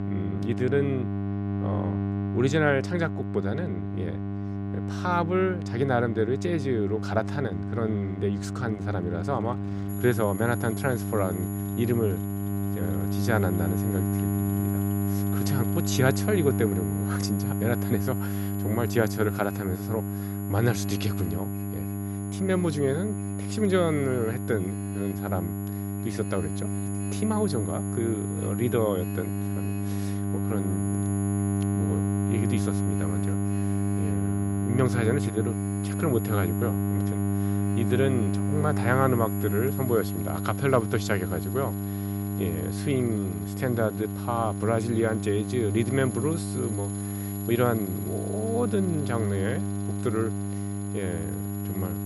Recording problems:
electrical hum; loud; throughout; 50 Hz, 7 dB below the speech
high-pitched whine; noticeable; from 10 s on; 11 kHz, 15 dB below the speech
traffic noise; faint; throughout; 25 dB below the speech

